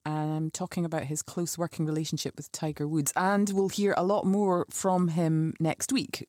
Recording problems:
none

